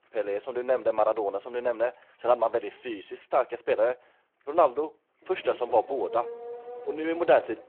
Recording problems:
phone-call audio
traffic noise; noticeable; throughout; 15 dB below the speech

